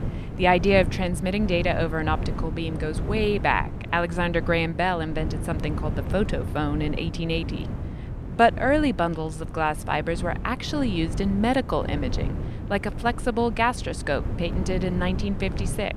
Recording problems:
wind noise on the microphone; occasional gusts; 15 dB below the speech

